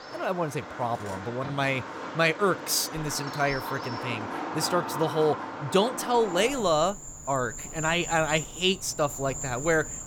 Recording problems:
animal sounds; loud; throughout; 8 dB below the speech

